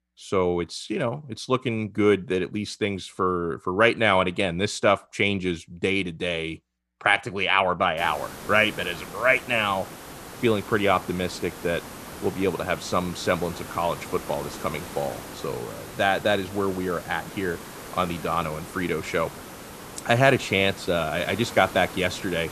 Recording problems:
hiss; noticeable; from 8 s on; 15 dB below the speech

